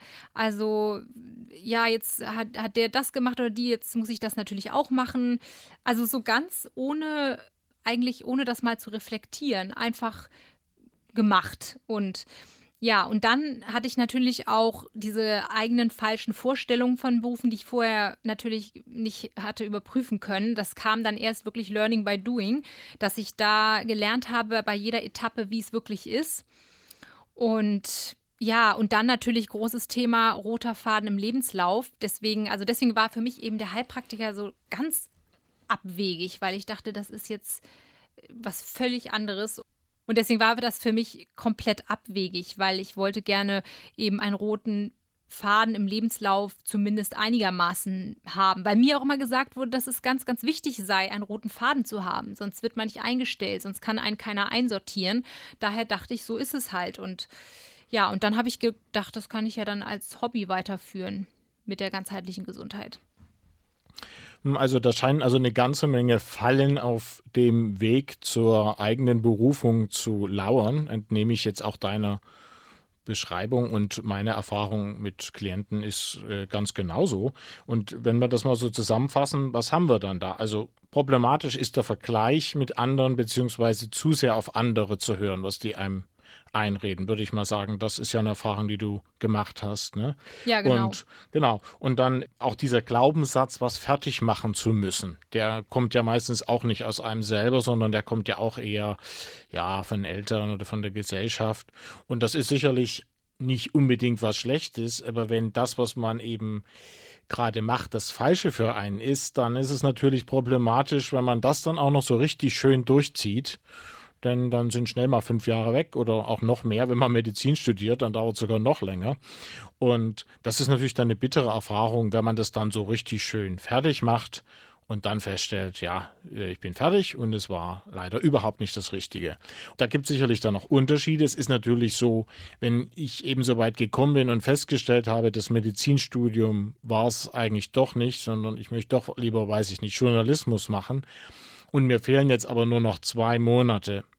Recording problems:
garbled, watery; slightly; nothing above 19 kHz

